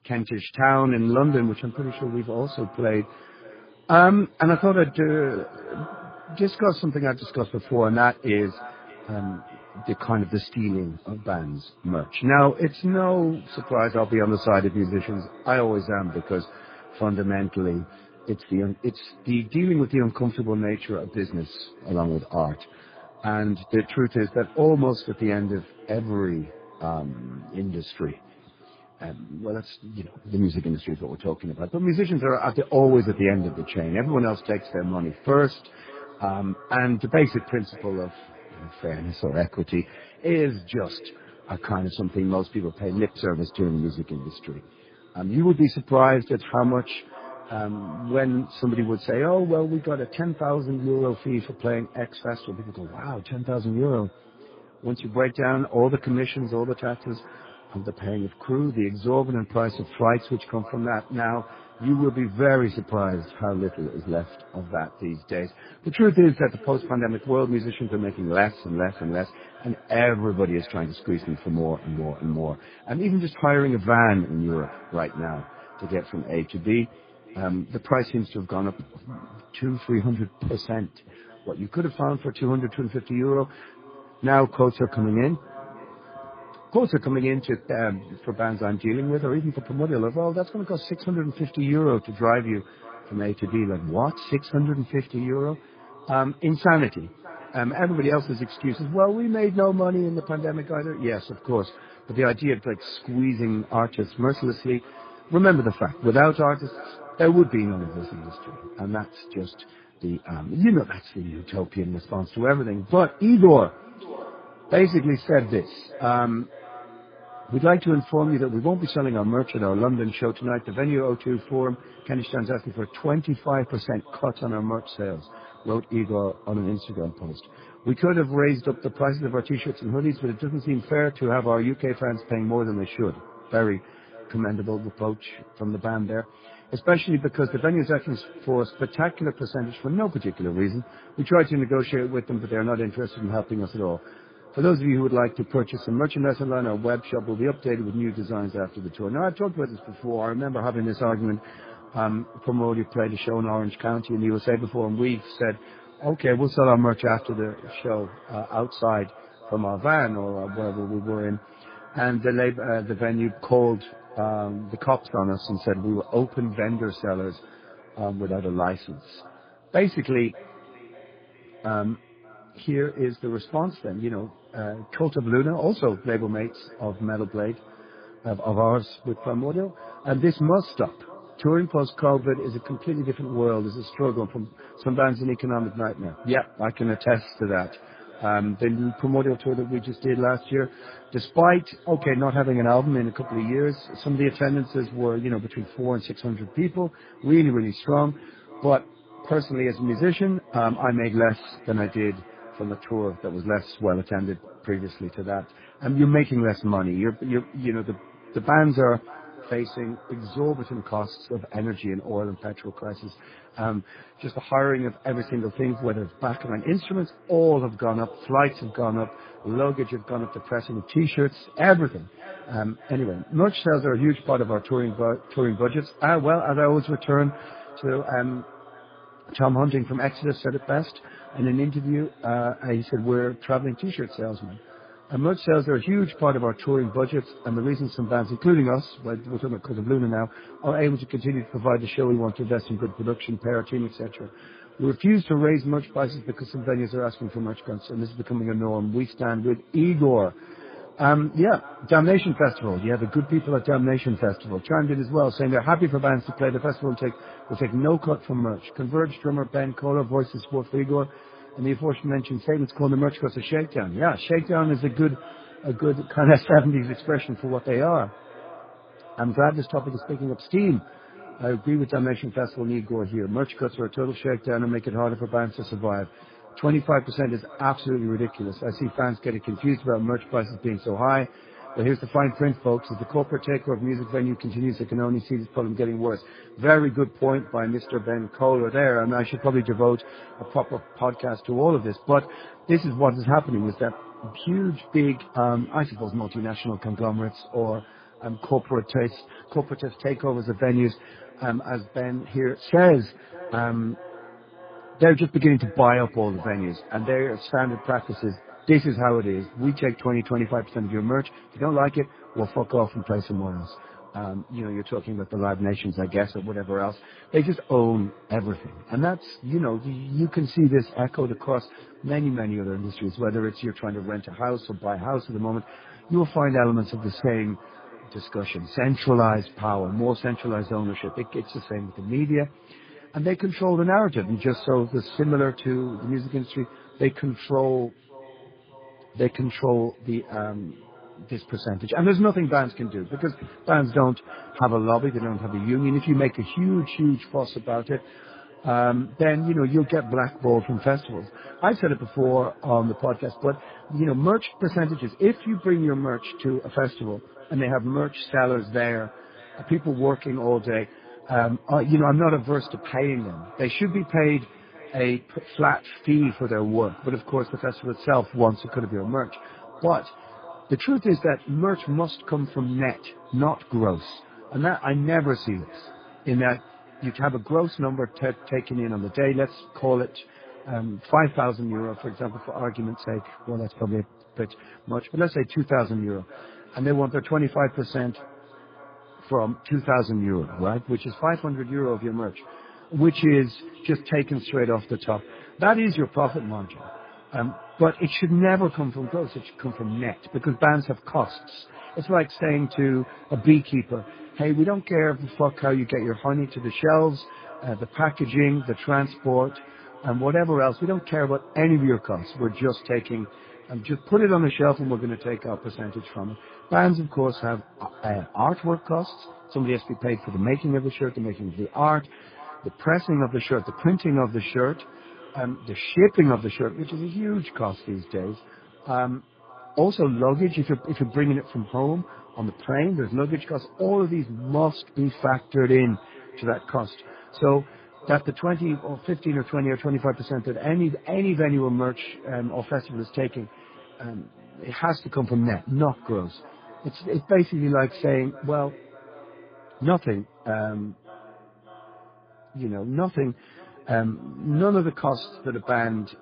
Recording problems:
garbled, watery; badly; nothing above 5 kHz
echo of what is said; faint; throughout; 590 ms later, 20 dB below the speech

